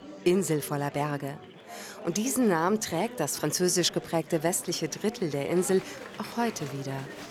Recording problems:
murmuring crowd; noticeable; throughout; 15 dB below the speech

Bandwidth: 19 kHz